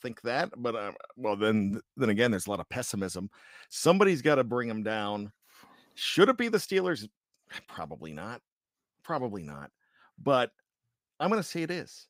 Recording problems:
none

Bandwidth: 15.5 kHz